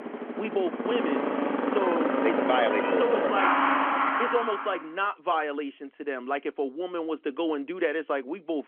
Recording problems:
phone-call audio; nothing above 3.5 kHz
traffic noise; very loud; until 4.5 s; 3 dB above the speech

